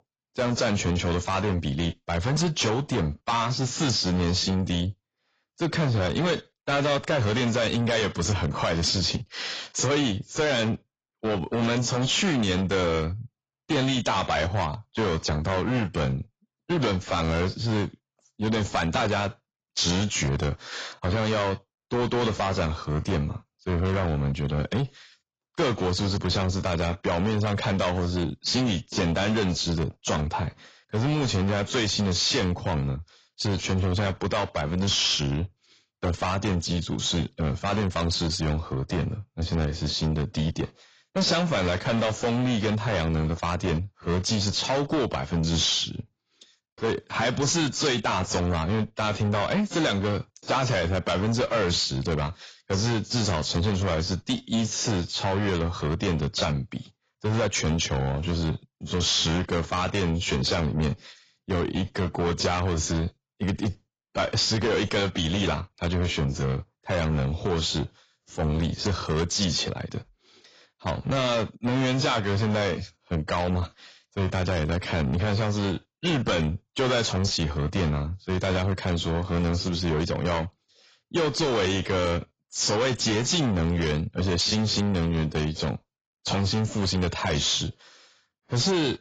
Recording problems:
distortion; heavy; 7 dB below the speech
garbled, watery; badly; nothing above 7.5 kHz

